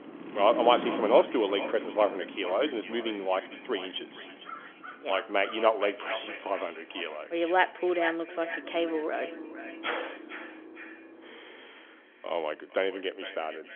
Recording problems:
echo of what is said; noticeable; throughout; 460 ms later, 15 dB below the speech
phone-call audio; nothing above 3.5 kHz
traffic noise; noticeable; throughout; 15 dB below the speech

